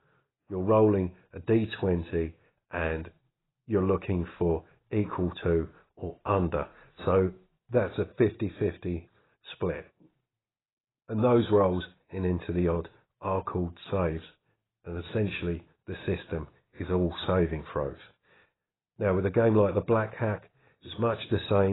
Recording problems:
garbled, watery; badly; nothing above 4 kHz
abrupt cut into speech; at the end

